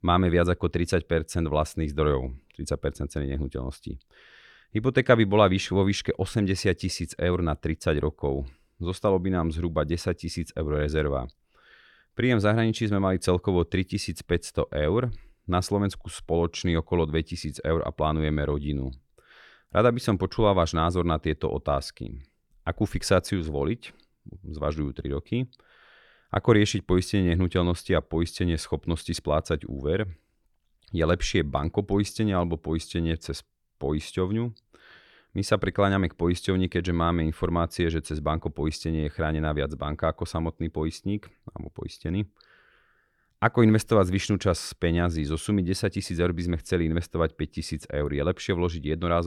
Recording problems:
abrupt cut into speech; at the end

